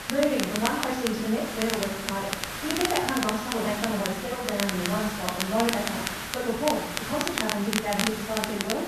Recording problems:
off-mic speech; far
wrong speed, natural pitch; too fast; 1.5 times normal speed
room echo; noticeable; dies away in 0.7 s
high frequencies cut off; noticeable; nothing above 6.5 kHz
hiss; loud; throughout; 5 dB below the speech
crackle, like an old record; loud; 4 dB below the speech

